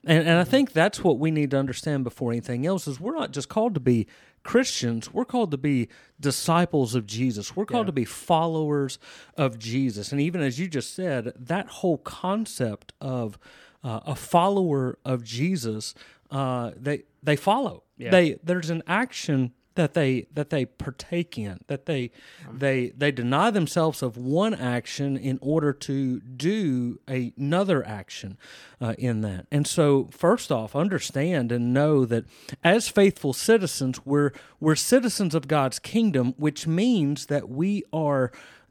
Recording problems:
none

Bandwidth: 18.5 kHz